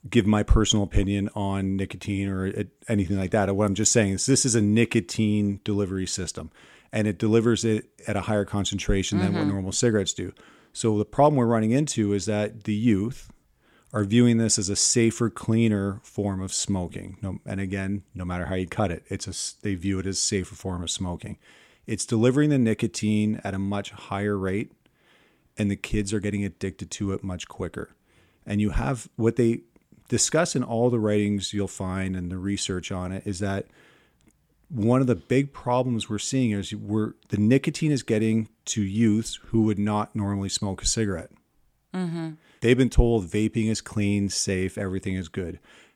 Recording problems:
none

